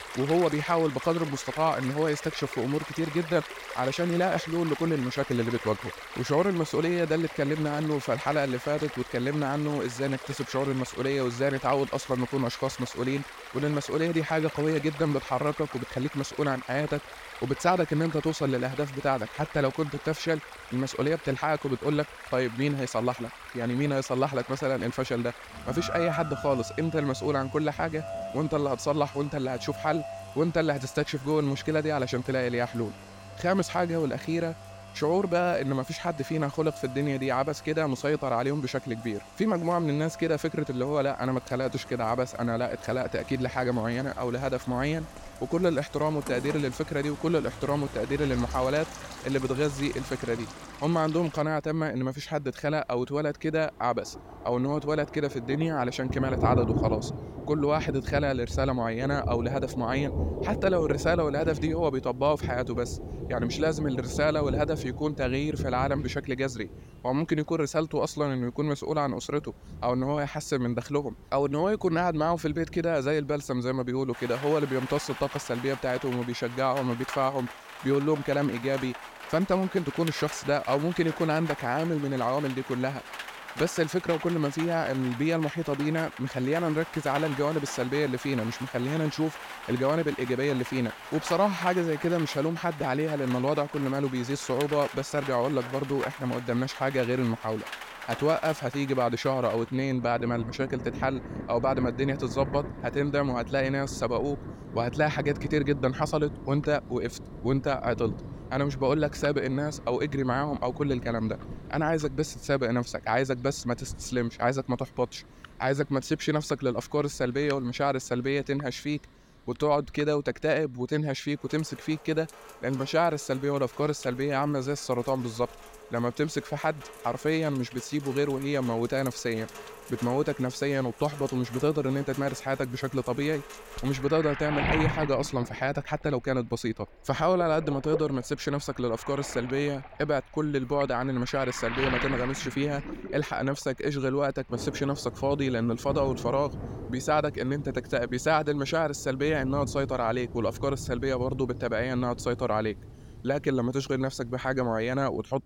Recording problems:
rain or running water; noticeable; throughout; 10 dB below the speech

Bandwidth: 16.5 kHz